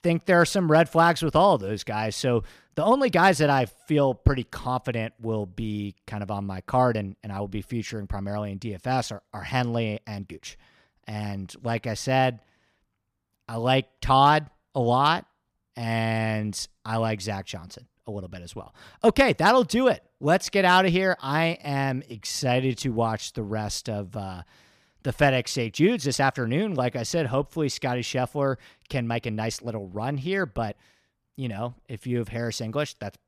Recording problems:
uneven, jittery; strongly; from 2.5 to 32 s

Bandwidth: 14.5 kHz